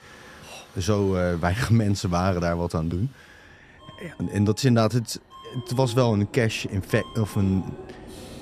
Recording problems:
train or aircraft noise; faint; throughout; 20 dB below the speech

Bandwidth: 14.5 kHz